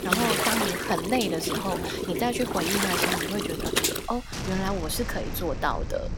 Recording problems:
rain or running water; very loud; throughout; 1 dB above the speech

